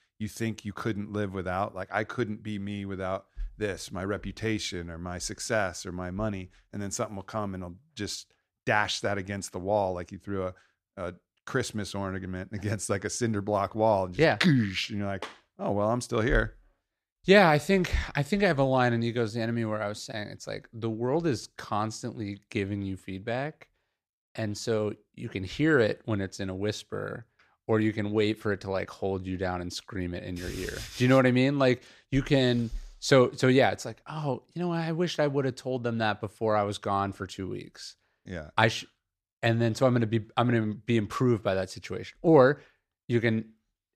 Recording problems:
none

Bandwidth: 14.5 kHz